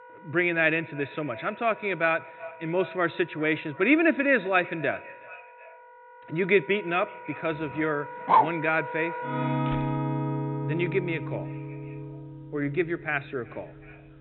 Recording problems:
high frequencies cut off; severe; nothing above 4 kHz
echo of what is said; faint; throughout; 370 ms later, 20 dB below the speech
background music; loud; throughout; 7 dB below the speech
dog barking; loud; at 8.5 s; peak 5 dB above the speech
door banging; faint; at 9.5 s; peak 15 dB below the speech

